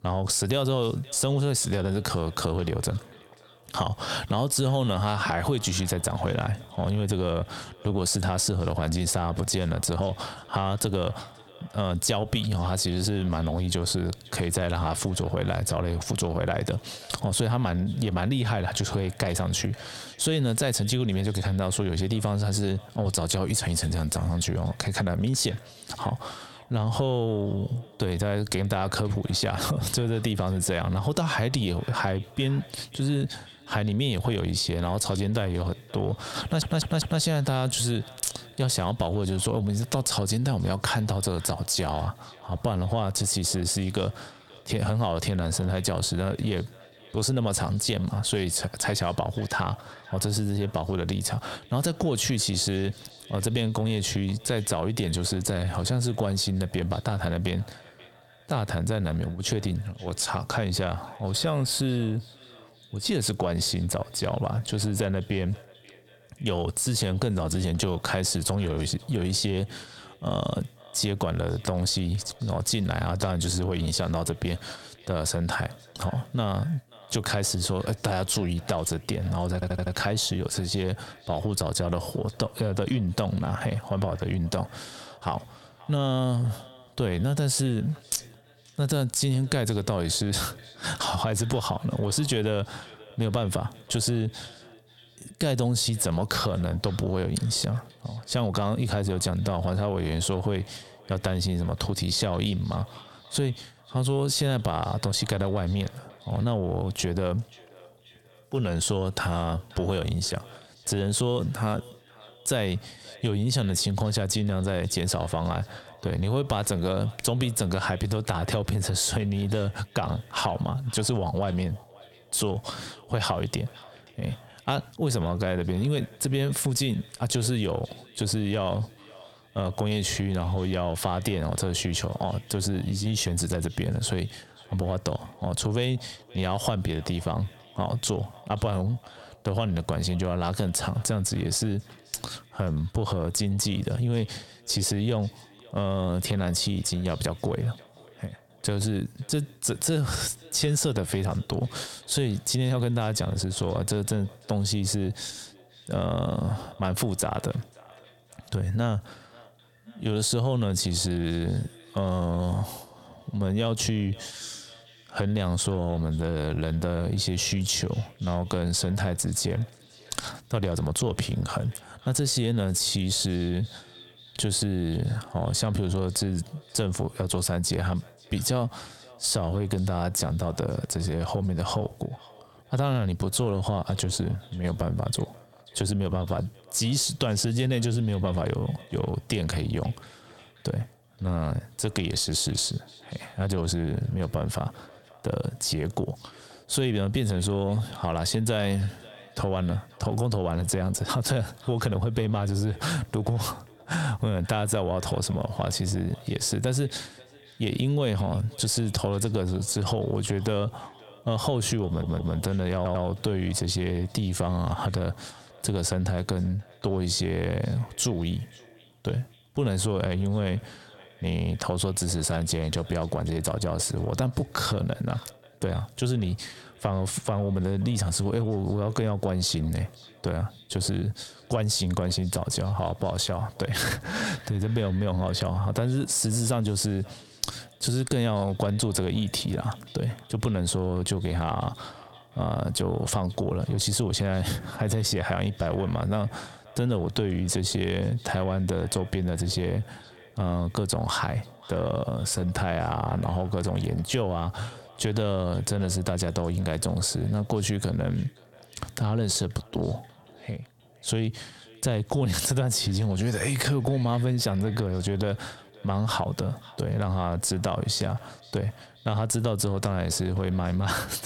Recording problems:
squashed, flat; heavily
echo of what is said; faint; throughout; 530 ms later, 25 dB below the speech
audio stuttering; 4 times, first at 36 s

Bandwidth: 17 kHz